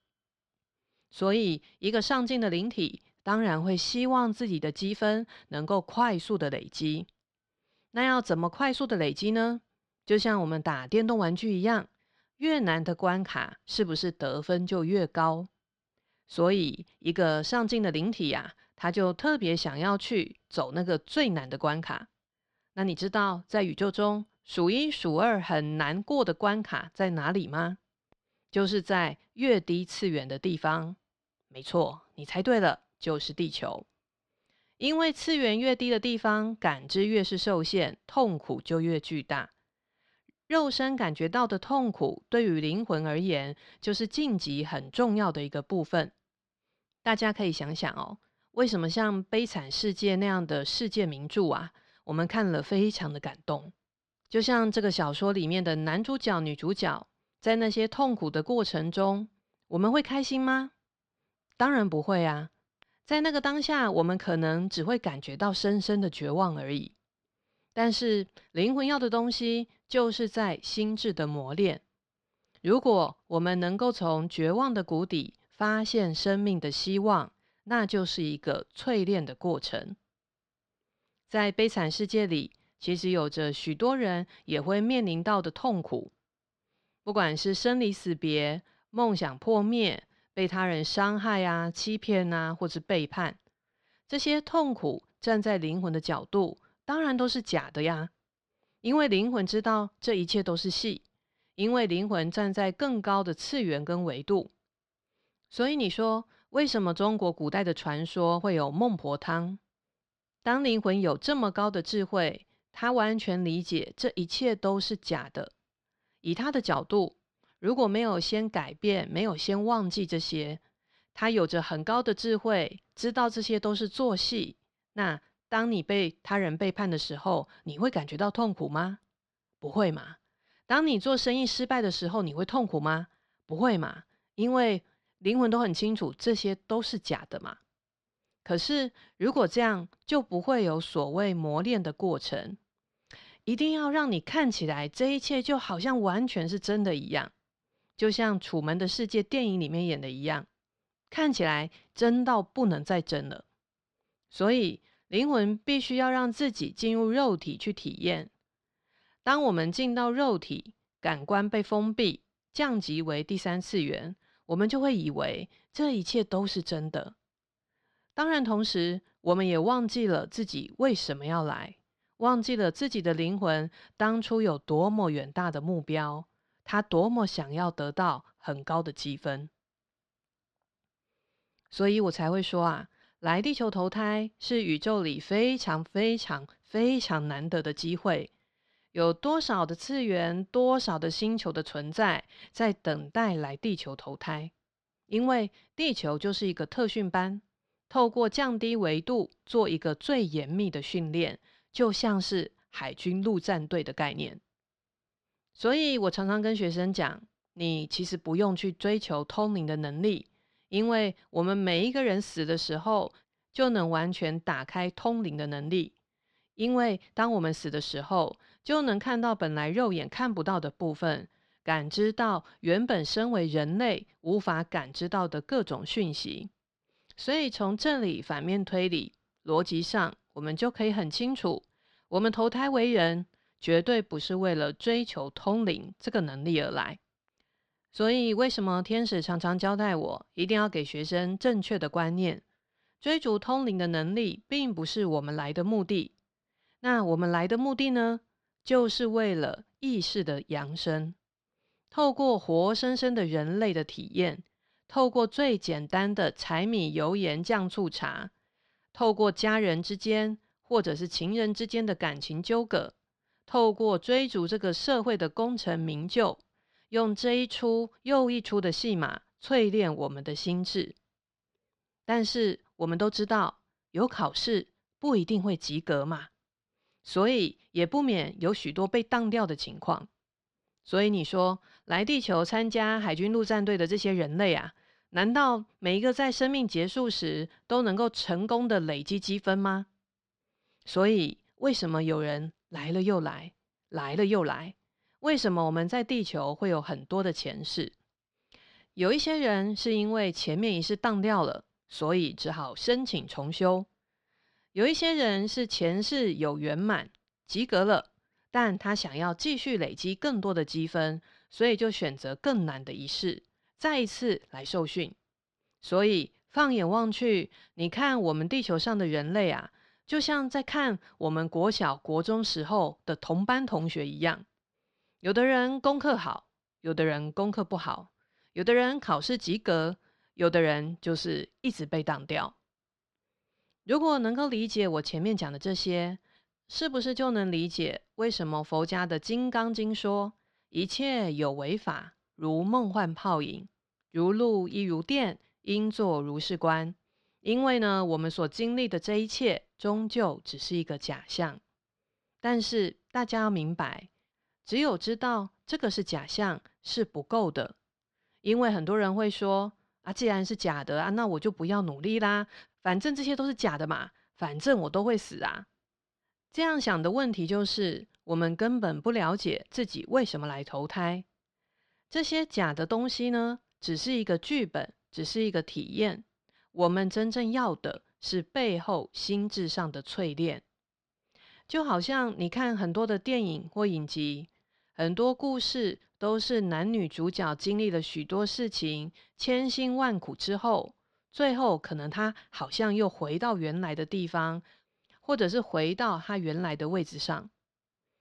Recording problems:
muffled; very slightly; fading above 4 kHz

